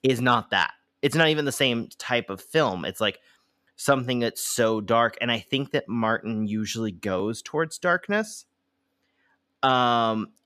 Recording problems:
none

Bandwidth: 14.5 kHz